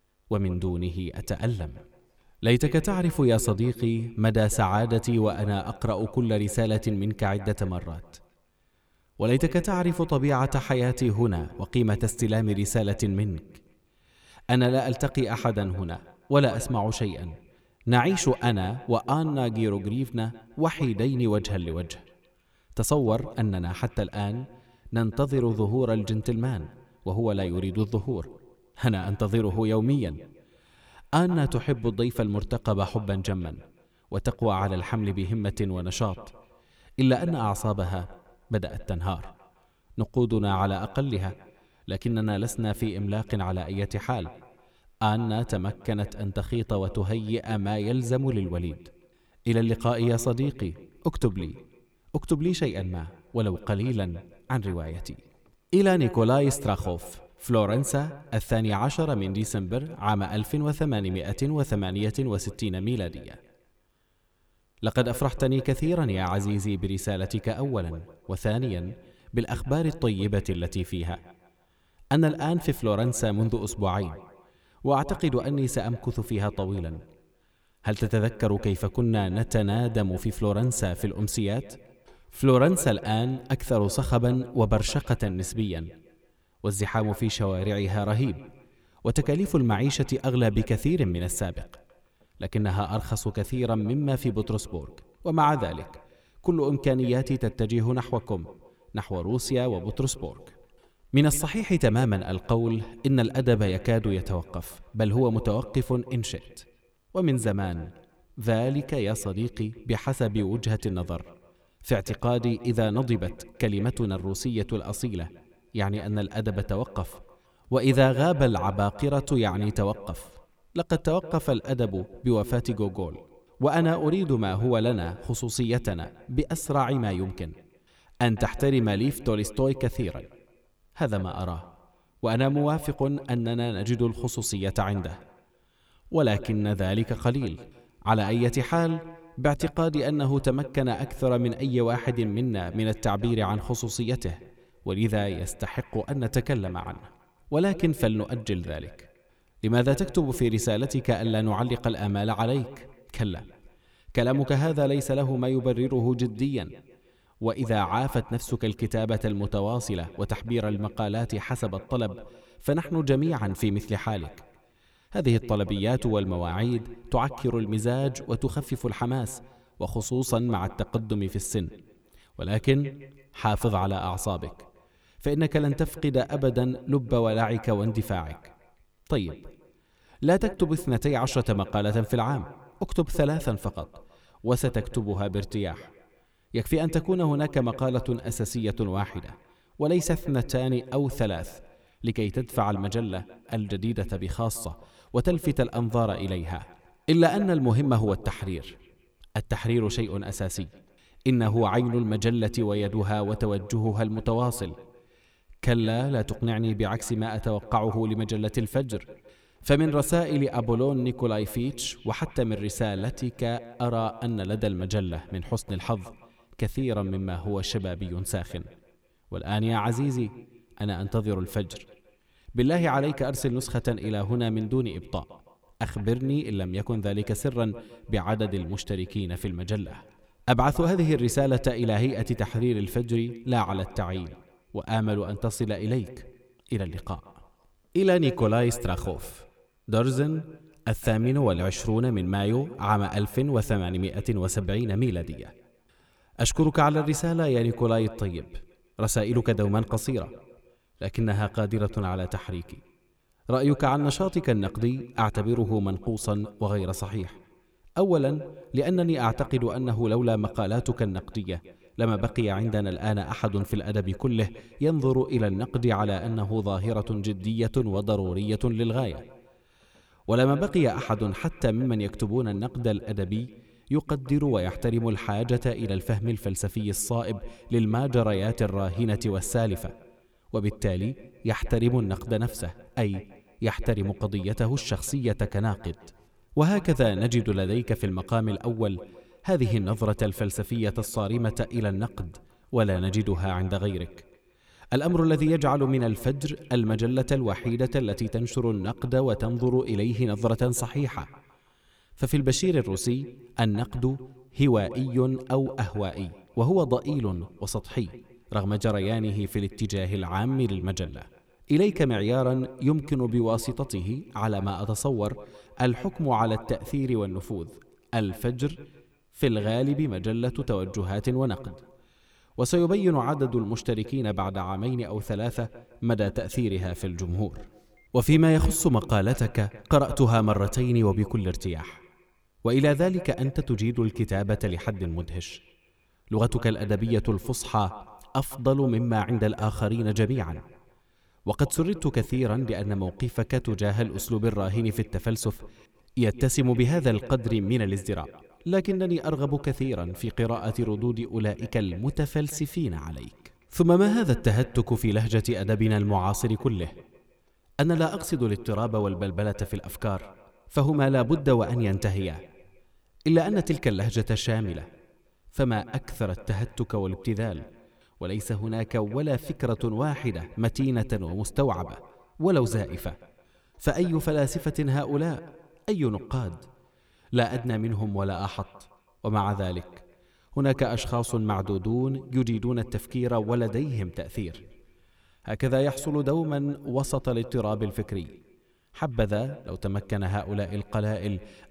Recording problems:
echo of what is said; noticeable; throughout; 160 ms later, 20 dB below the speech

